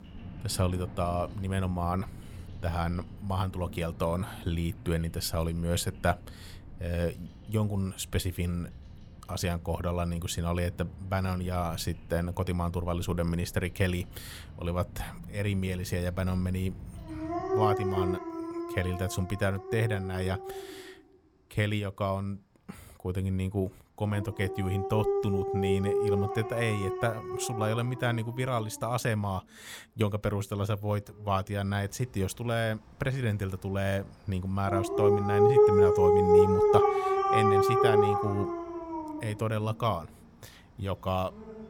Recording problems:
animal sounds; very loud; throughout; 4 dB above the speech

